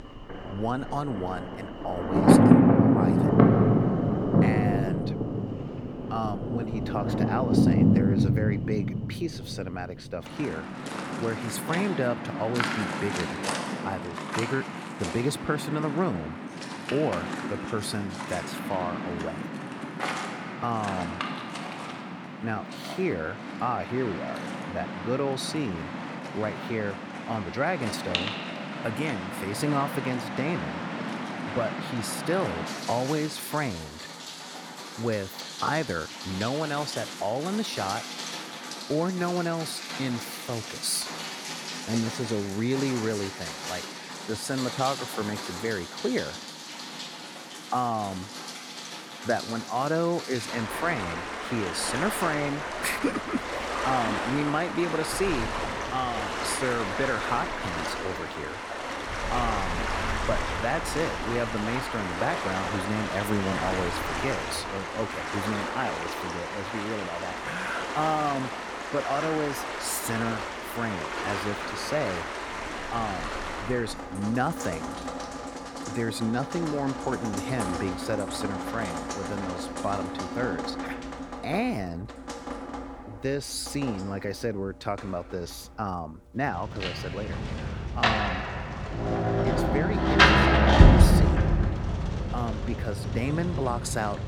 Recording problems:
rain or running water; very loud; throughout; 2 dB above the speech

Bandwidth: 19 kHz